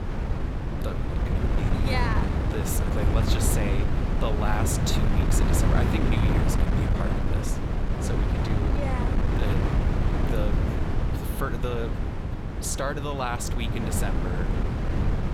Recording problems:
wind noise on the microphone; heavy; as loud as the speech

